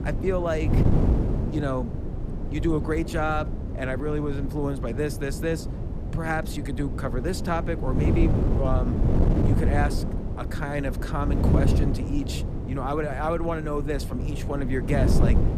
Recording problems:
wind noise on the microphone; heavy; 5 dB below the speech

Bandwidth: 14.5 kHz